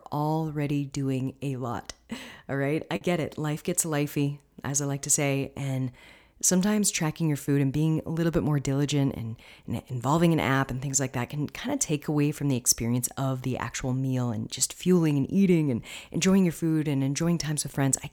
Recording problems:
choppy; occasionally; at 3 s; 4% of the speech affected

